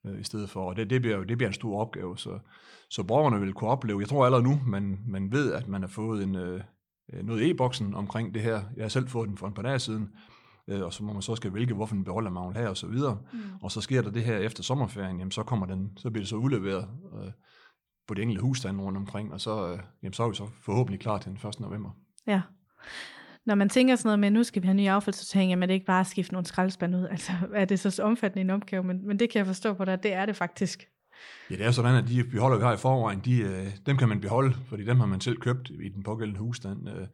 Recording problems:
none

